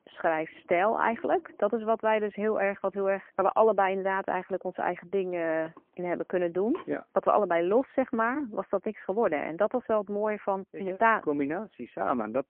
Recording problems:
phone-call audio; poor line
household noises; faint; until 8.5 s; 25 dB below the speech

